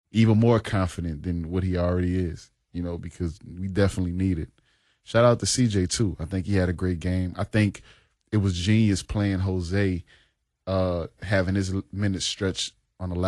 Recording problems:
garbled, watery; slightly
abrupt cut into speech; at the end

